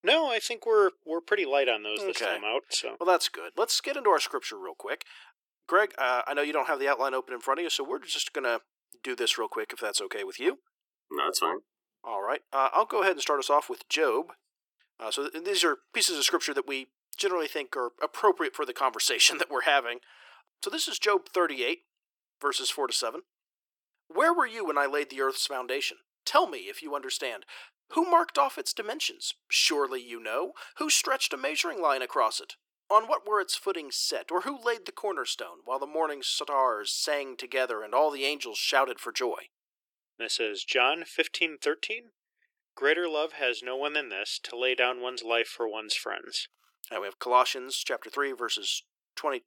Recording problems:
thin; very; fading below 350 Hz

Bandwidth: 17.5 kHz